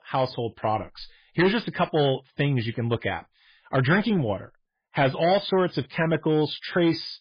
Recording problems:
garbled, watery; badly; nothing above 5 kHz
distortion; slight; 5% of the sound clipped

